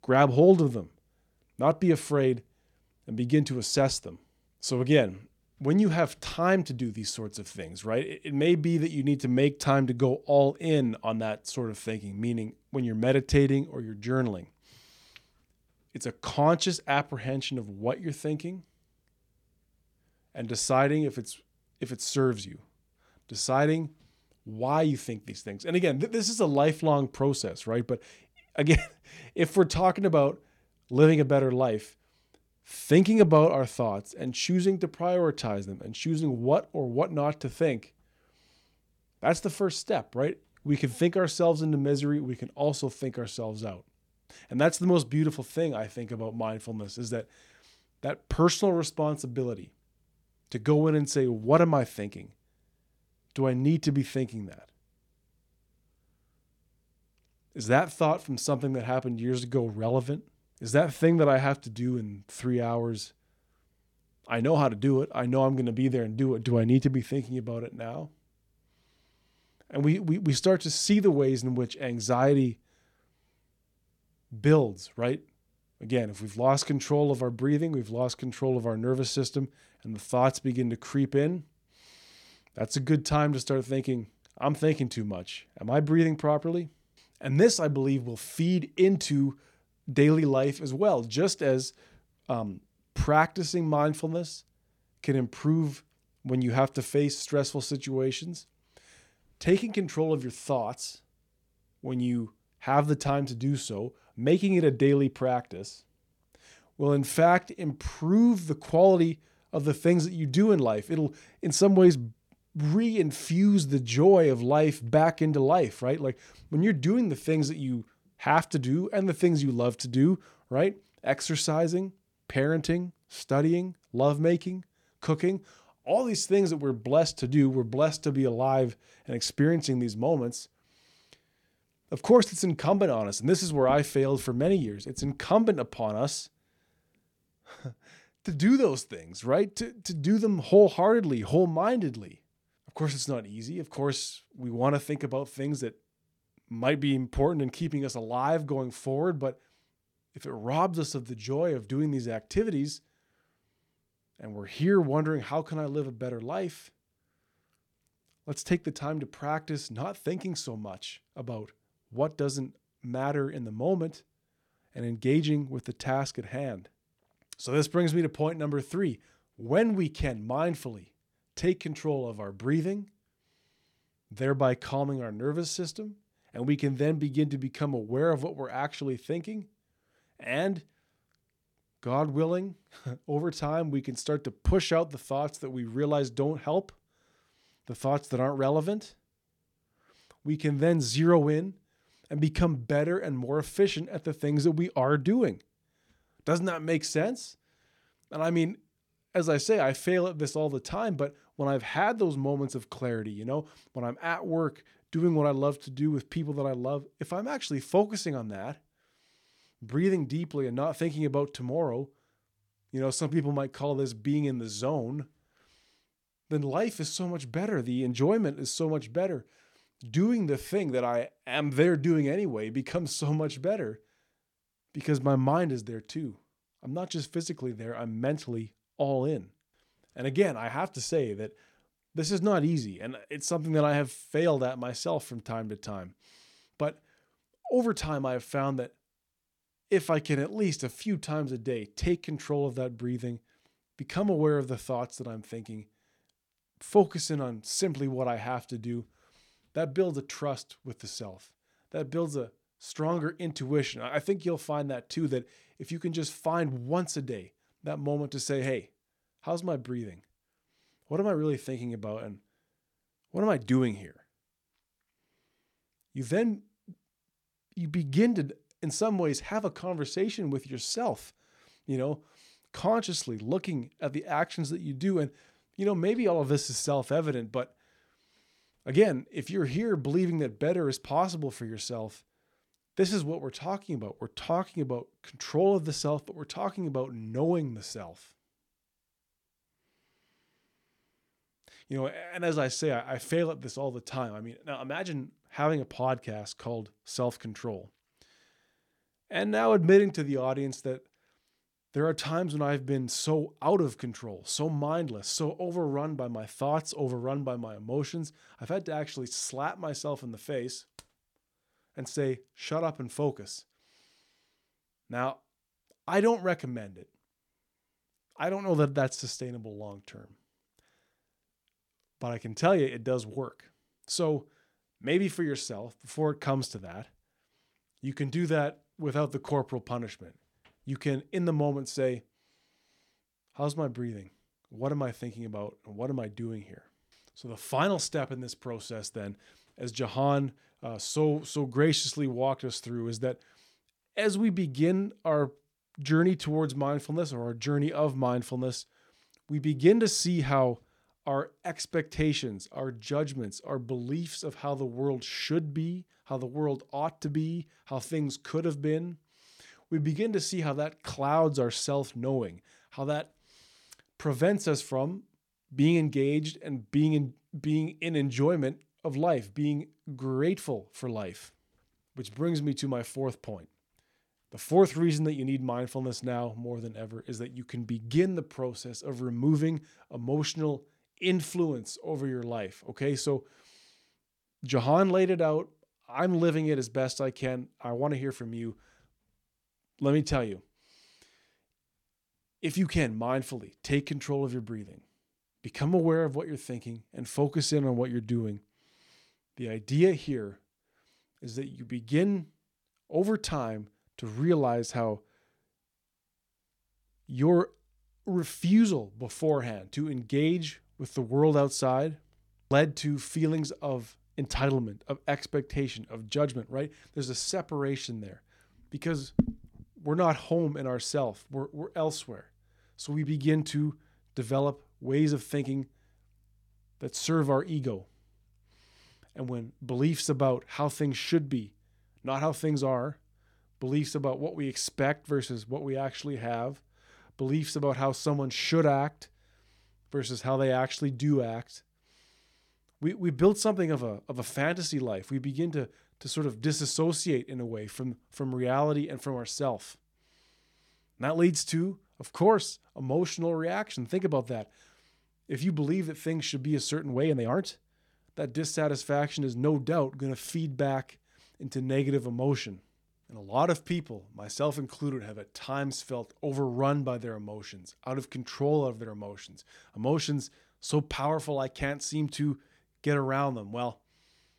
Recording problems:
uneven, jittery; strongly; from 11 s to 7:37

